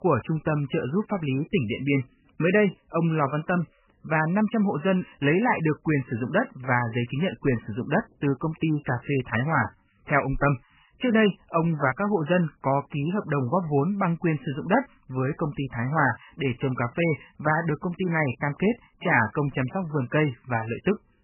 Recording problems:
garbled, watery; badly; nothing above 3 kHz

